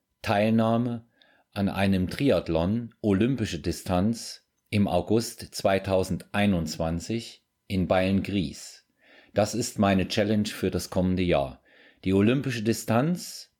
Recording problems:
none

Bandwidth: 18 kHz